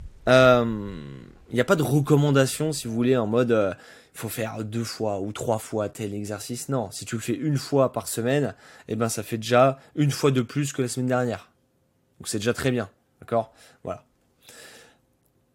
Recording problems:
wind in the background; faint; until 3 s; 30 dB below the speech

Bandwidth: 16 kHz